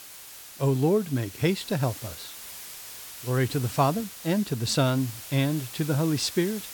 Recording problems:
hiss; noticeable; throughout; 15 dB below the speech

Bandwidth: 18 kHz